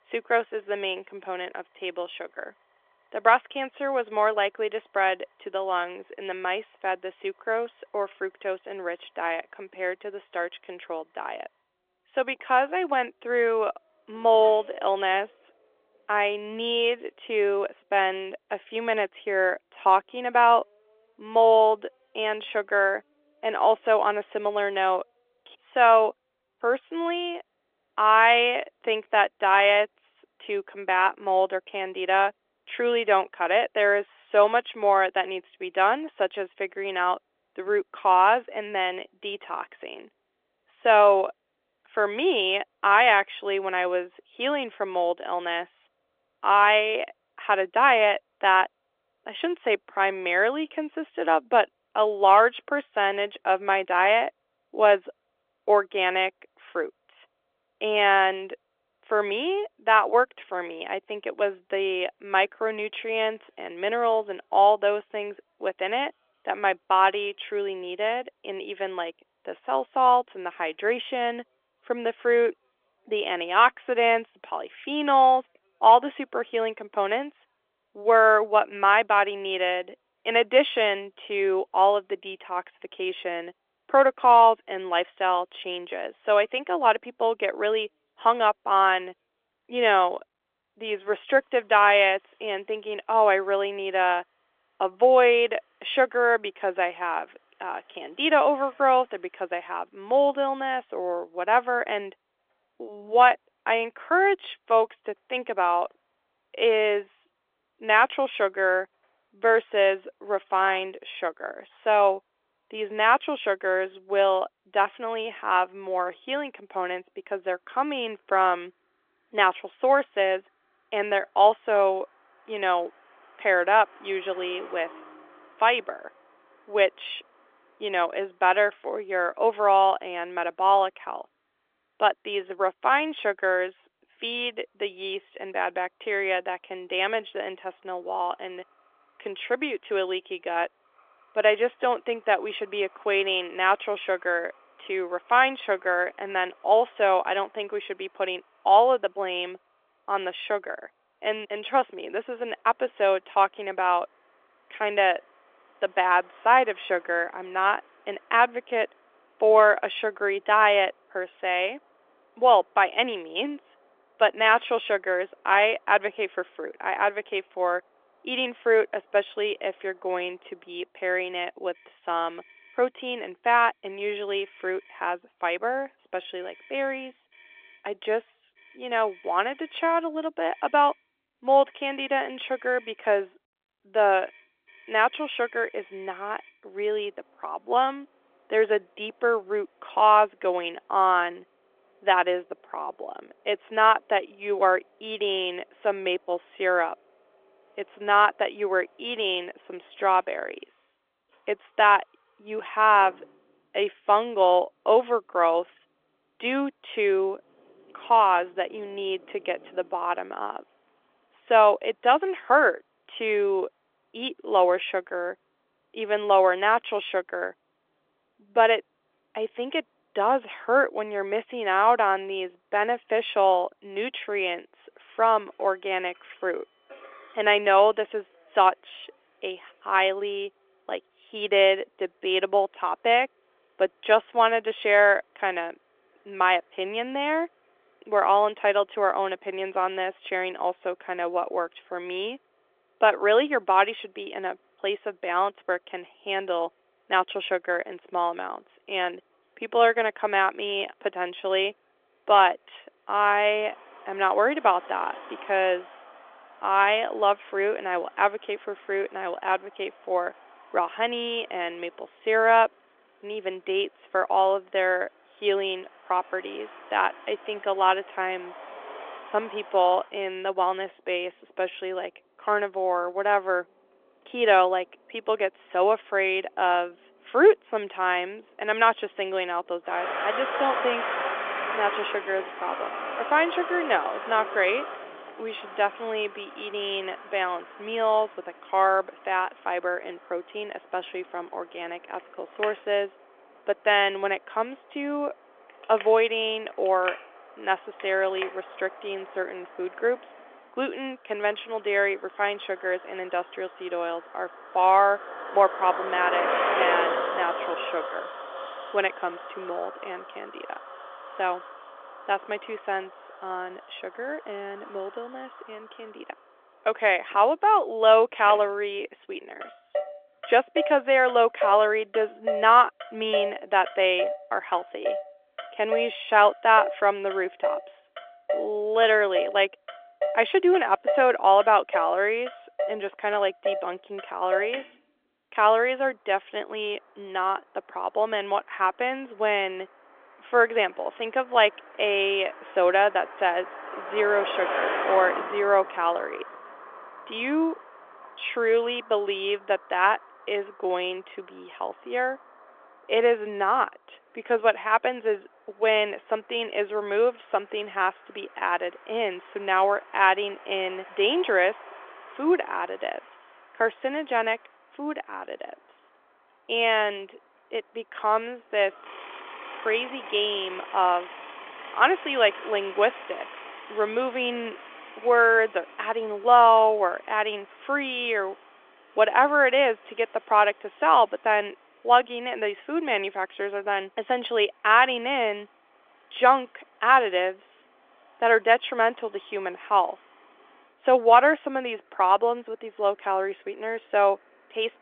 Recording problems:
phone-call audio; nothing above 3.5 kHz
traffic noise; noticeable; throughout; 10 dB below the speech

